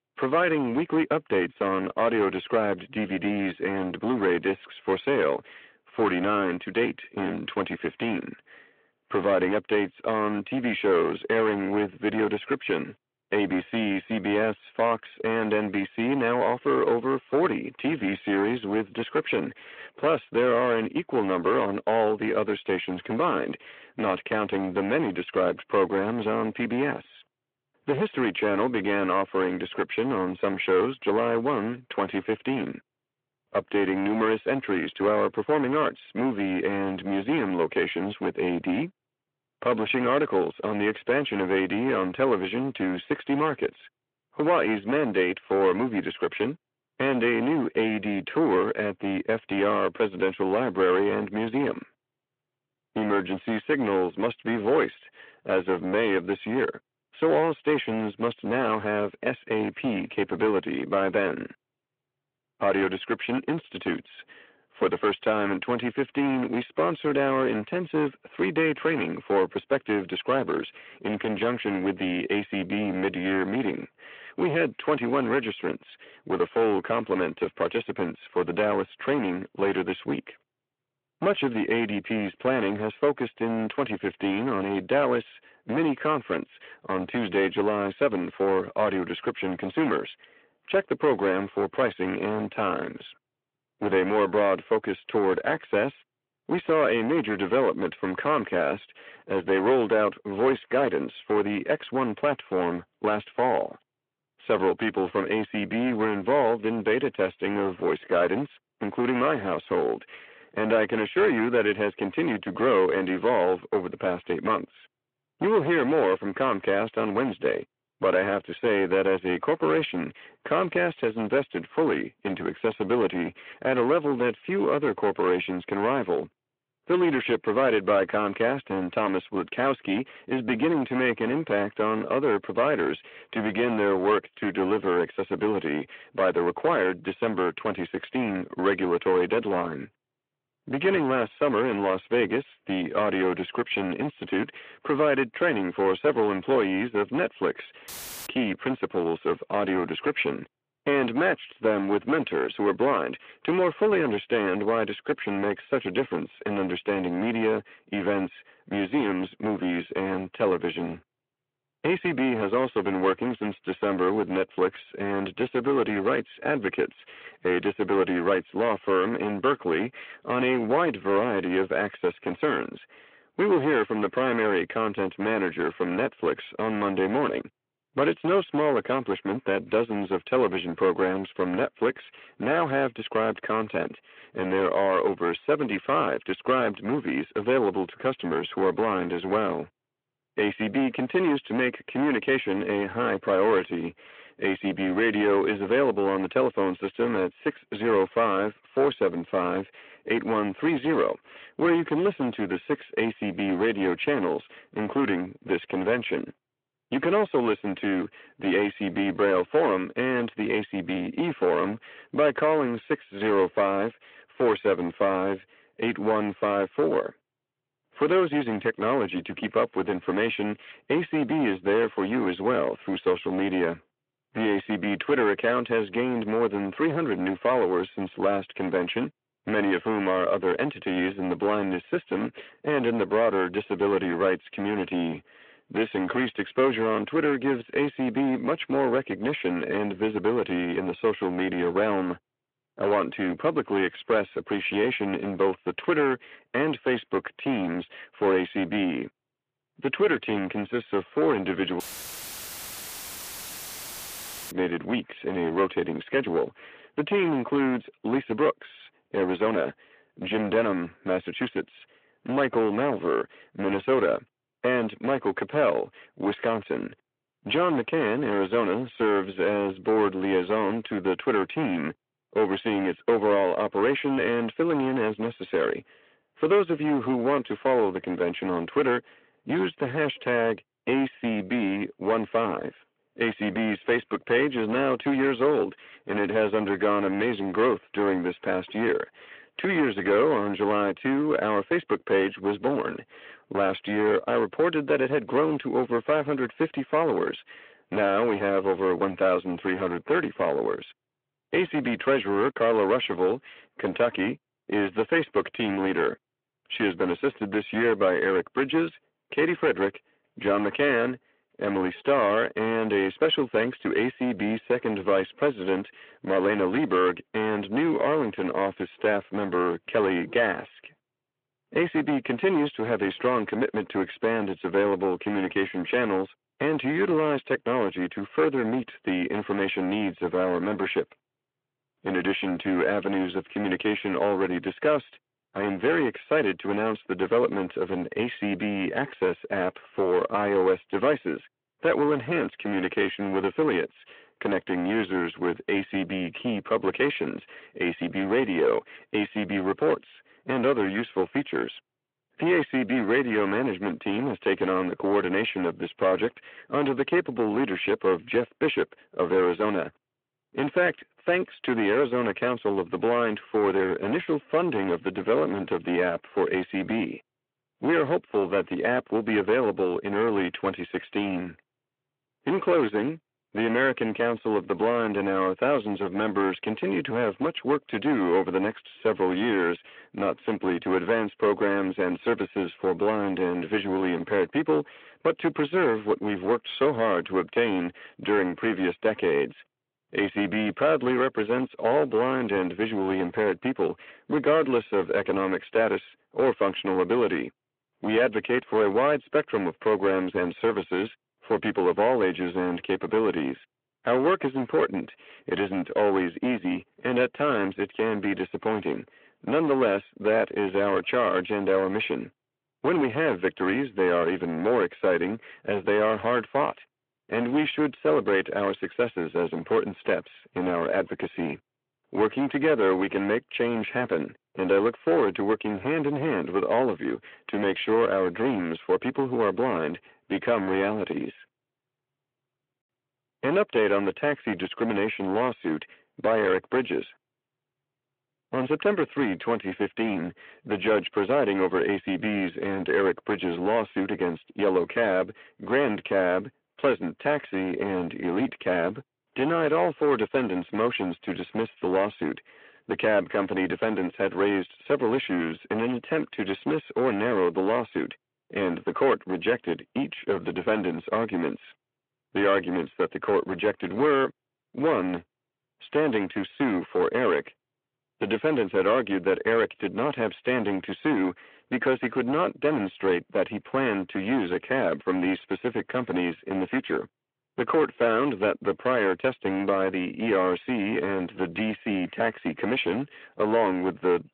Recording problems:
distortion; heavy; 12% of the sound clipped
phone-call audio
audio cutting out; filled with static; at 2:28 and at 4:12 for 2.5 s

